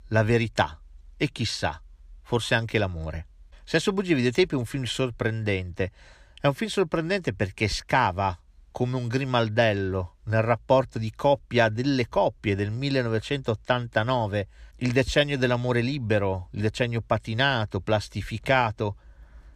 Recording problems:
none

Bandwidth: 15 kHz